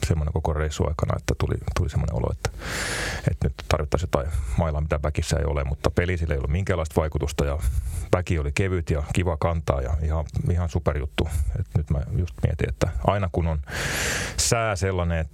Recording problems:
squashed, flat; heavily

